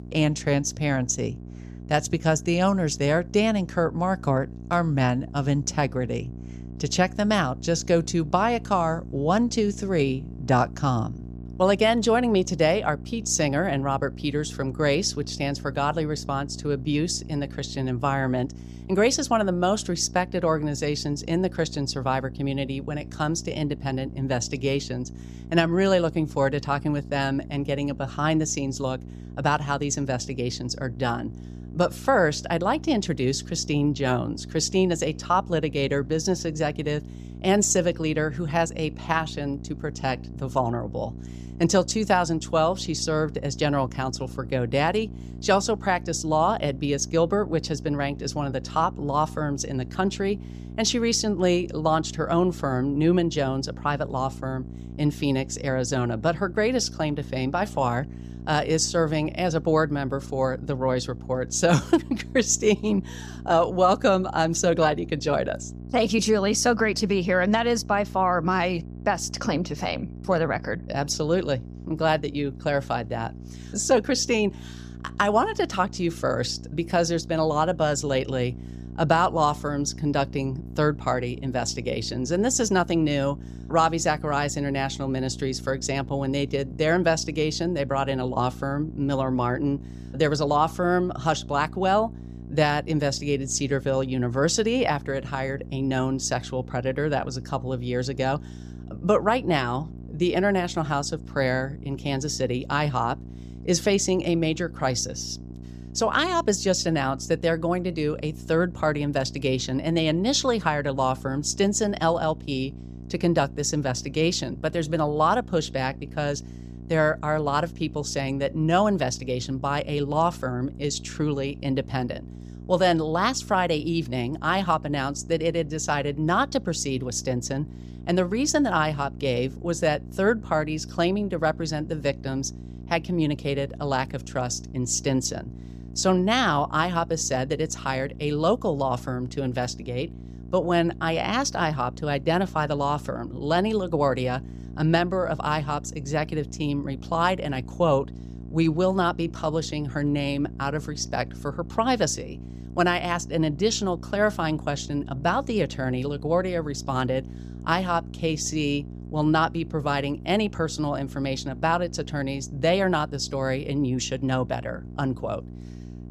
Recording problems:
electrical hum; faint; throughout; 60 Hz, 20 dB below the speech

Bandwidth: 14.5 kHz